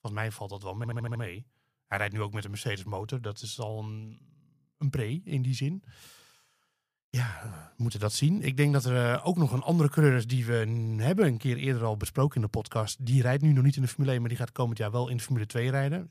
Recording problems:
audio stuttering; at 1 s

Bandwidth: 15 kHz